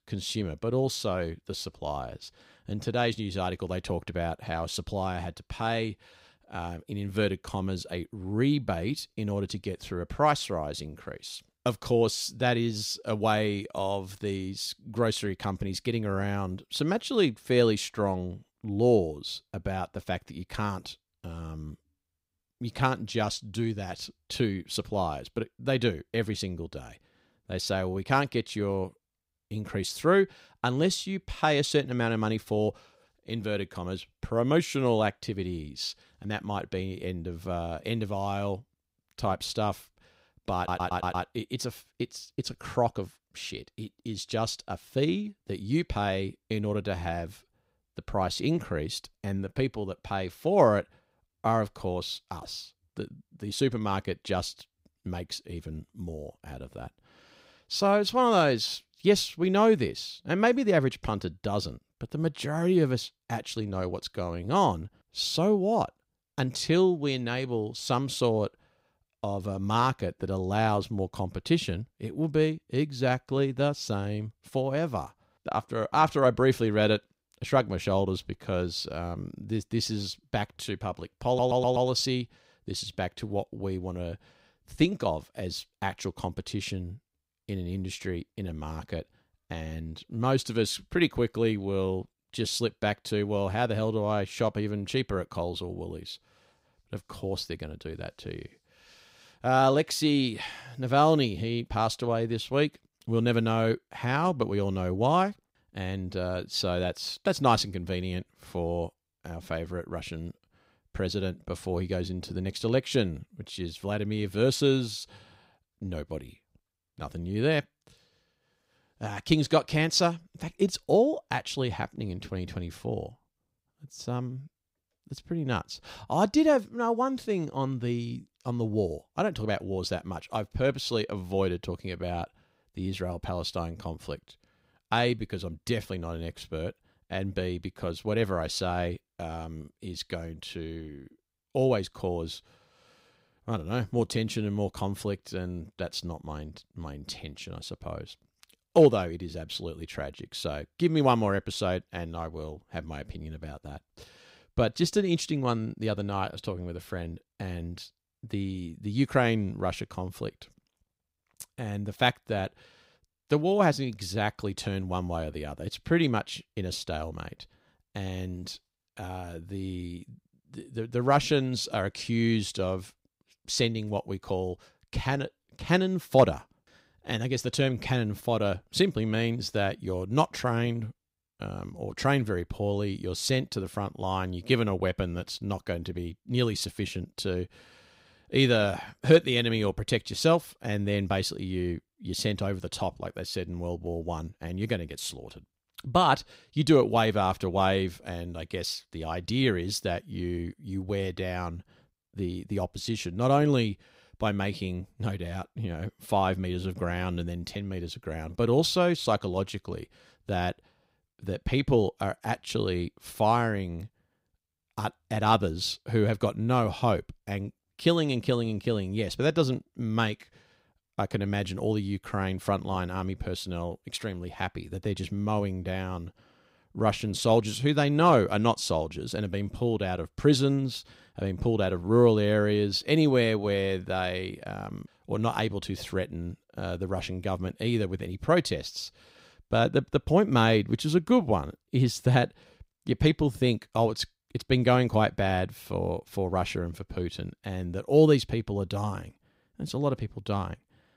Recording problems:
audio stuttering; at 41 s and at 1:21

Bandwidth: 15.5 kHz